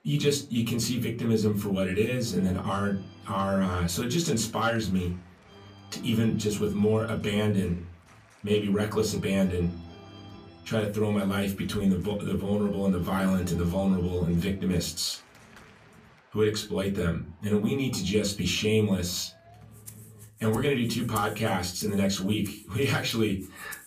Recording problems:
off-mic speech; far
room echo; very slight; dies away in 0.3 s
background music; faint; throughout; 20 dB below the speech

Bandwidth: 15 kHz